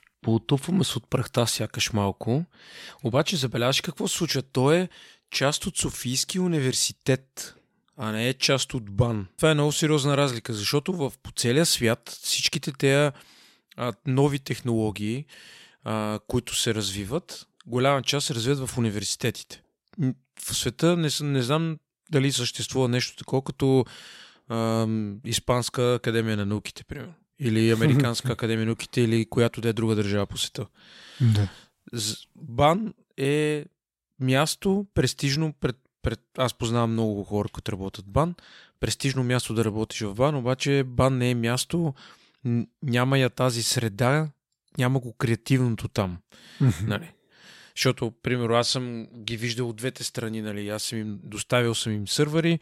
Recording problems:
none

